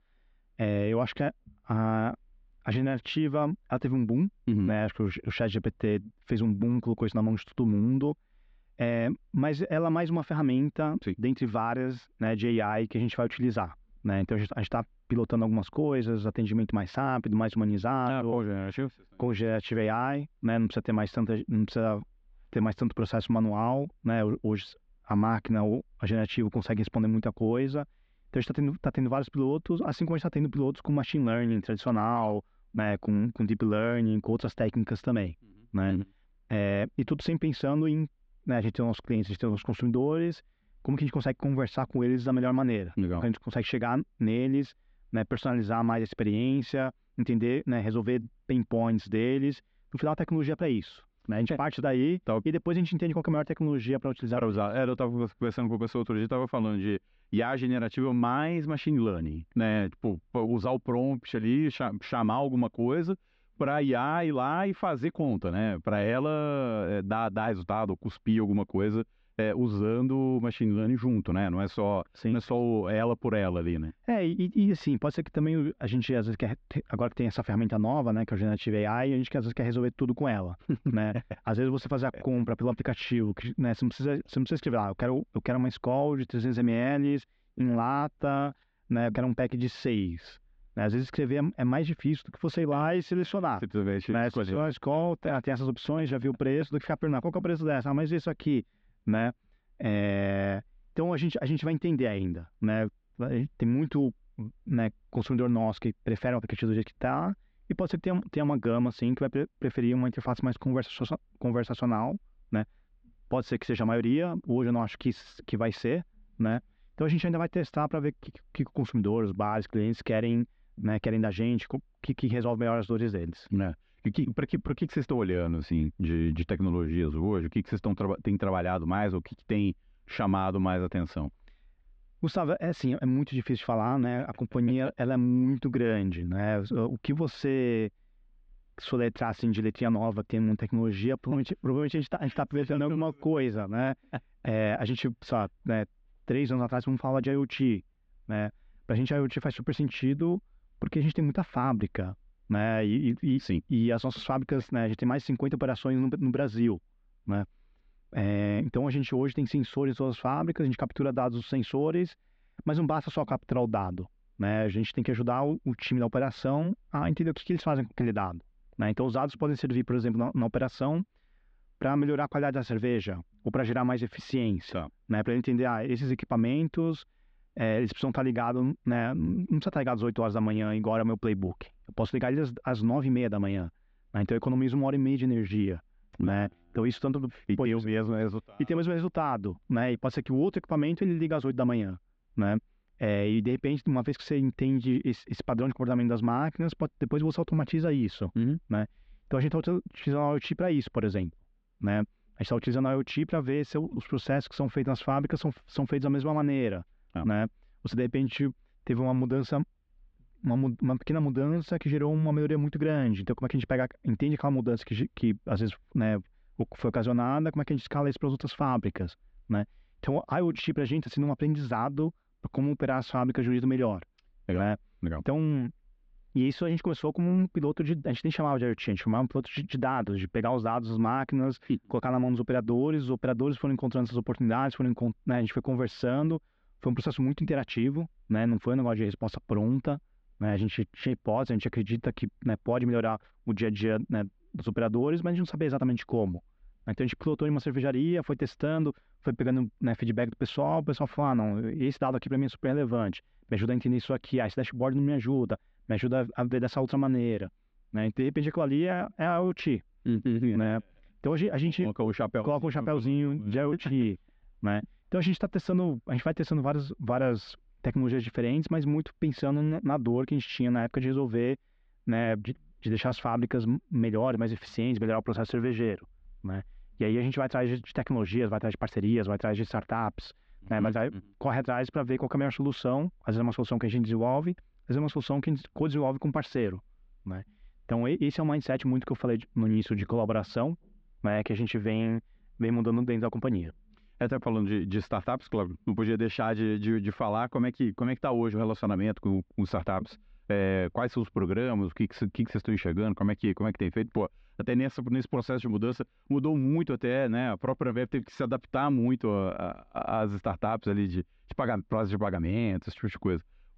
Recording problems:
muffled; slightly; fading above 3.5 kHz

